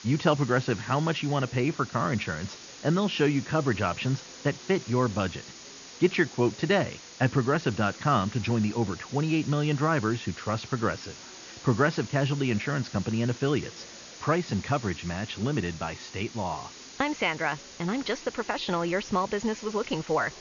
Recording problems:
high frequencies cut off; noticeable; nothing above 7 kHz
muffled; very slightly; fading above 2.5 kHz
hiss; noticeable; throughout; 15 dB below the speech
background chatter; faint; throughout; 3 voices, 30 dB below the speech

